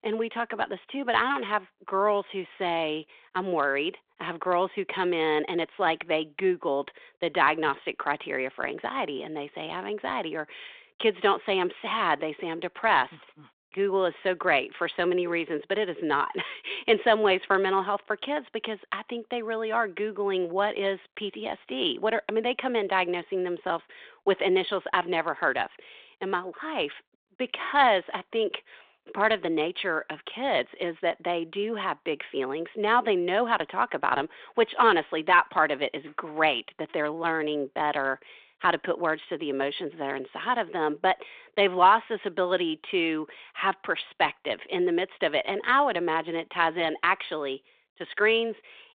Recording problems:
phone-call audio

